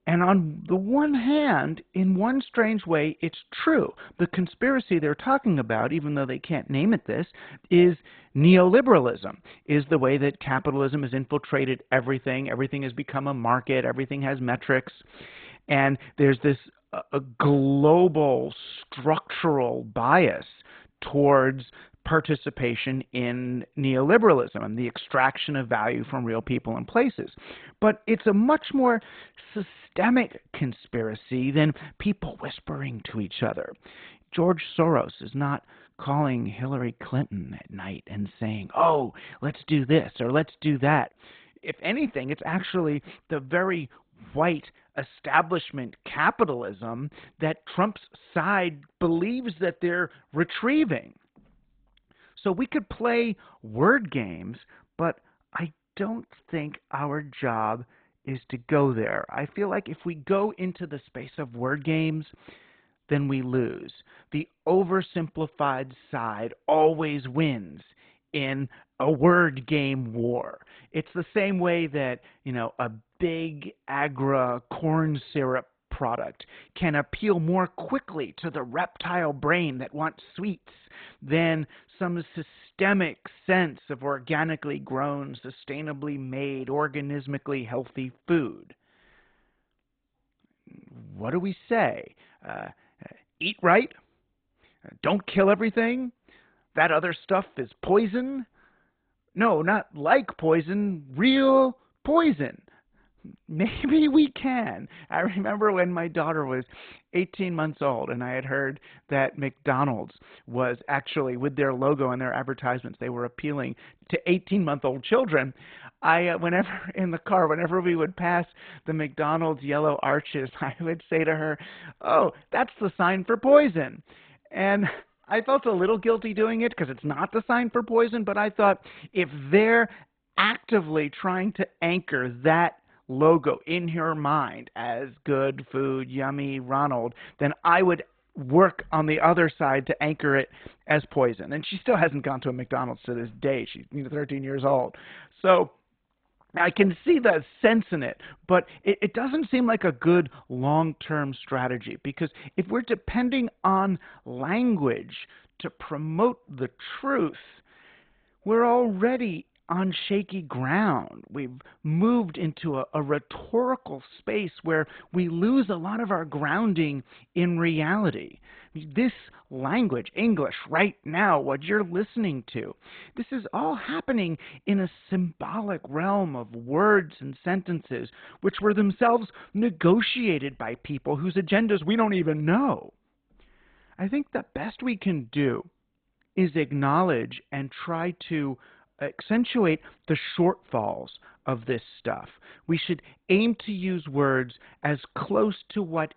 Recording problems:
garbled, watery; badly
high frequencies cut off; severe; nothing above 4 kHz

